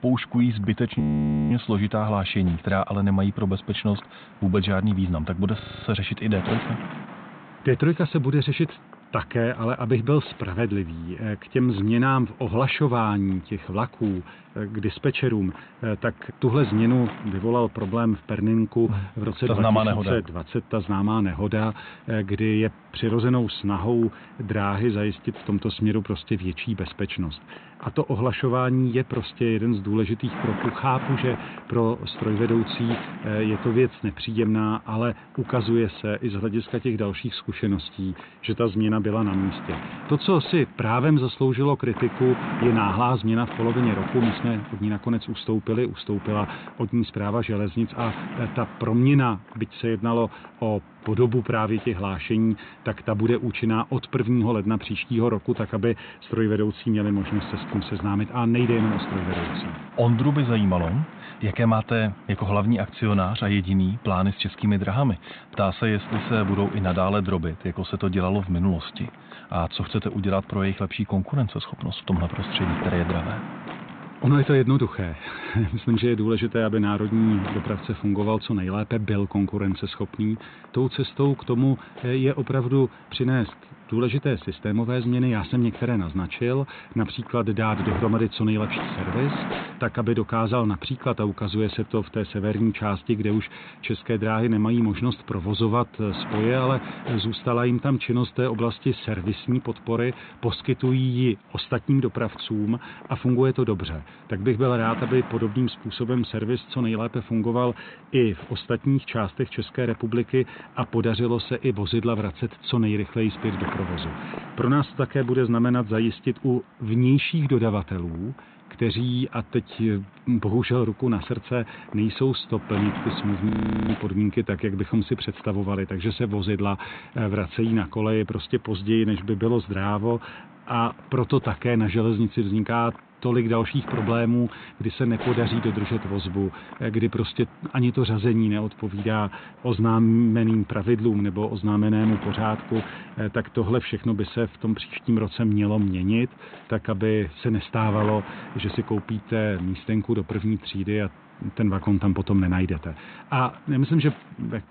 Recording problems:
high frequencies cut off; severe; nothing above 4 kHz
wind noise on the microphone; occasional gusts; 10 dB below the speech
audio freezing; at 1 s for 0.5 s, at 5.5 s and at 2:03

